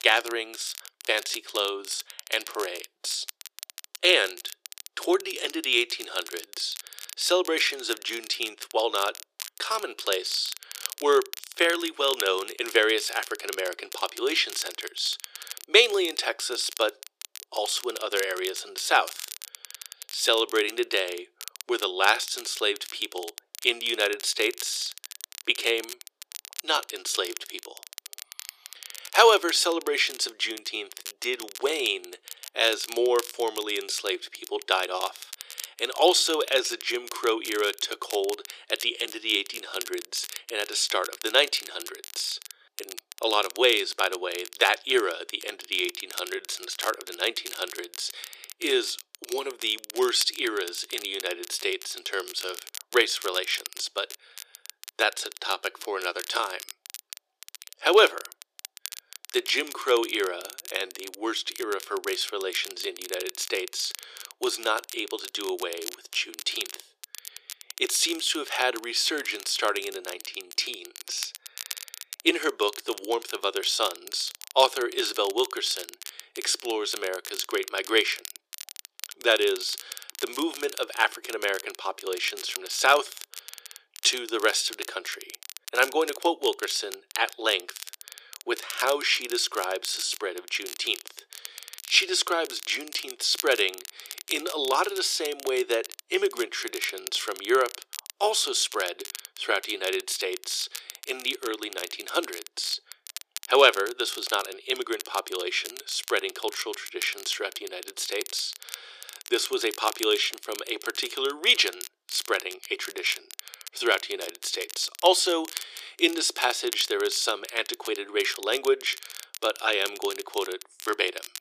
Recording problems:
thin; very; fading below 350 Hz
crackle, like an old record; noticeable; 15 dB below the speech

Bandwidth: 14.5 kHz